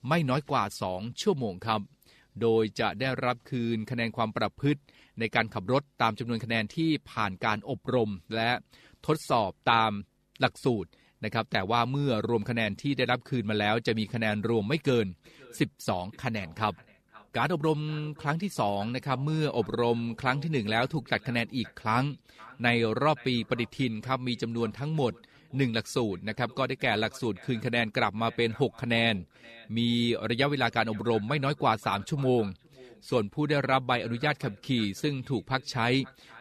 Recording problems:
echo of what is said; faint; from 15 s on; 520 ms later, 25 dB below the speech

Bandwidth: 14 kHz